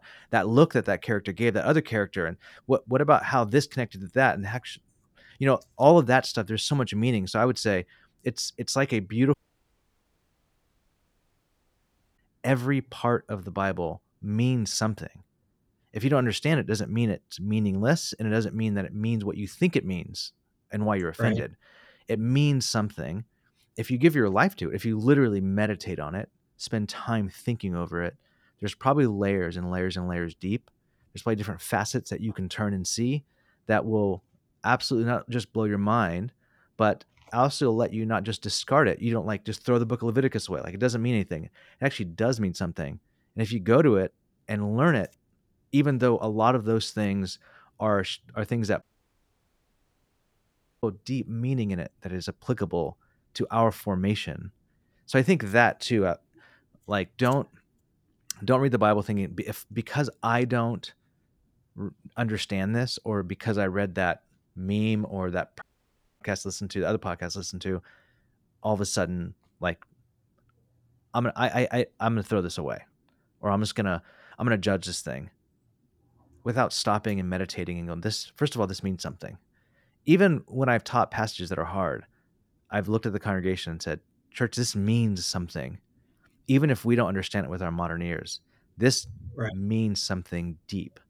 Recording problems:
audio cutting out; at 9.5 s for 3 s, at 49 s for 2 s and at 1:06 for 0.5 s

